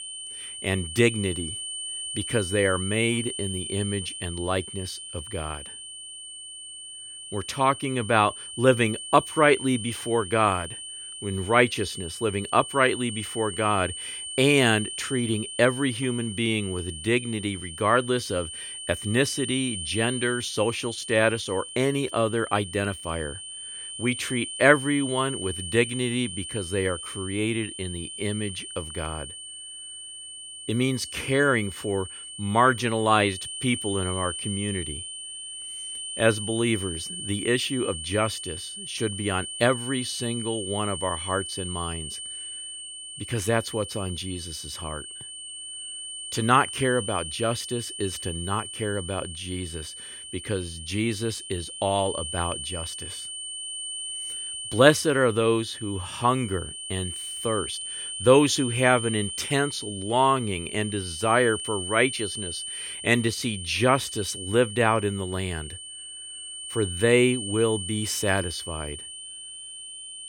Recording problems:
high-pitched whine; loud; throughout; 3 kHz, 8 dB below the speech

